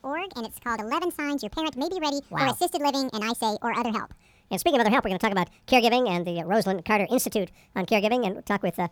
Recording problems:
wrong speed and pitch; too fast and too high; 1.5 times normal speed

